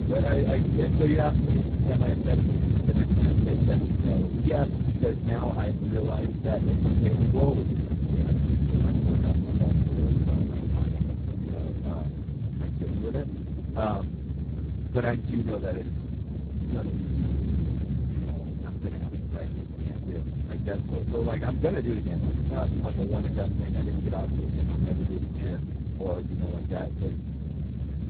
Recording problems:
garbled, watery; badly
low rumble; loud; throughout; 4 dB below the speech

